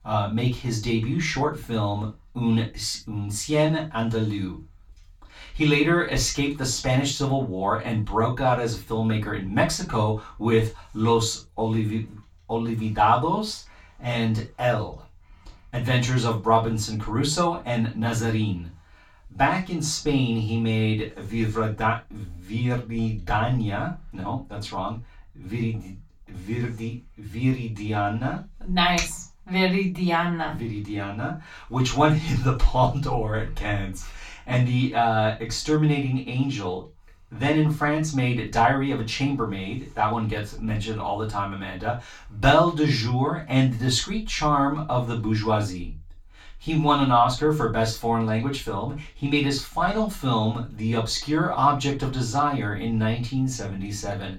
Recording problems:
off-mic speech; far
room echo; slight; dies away in 0.2 s

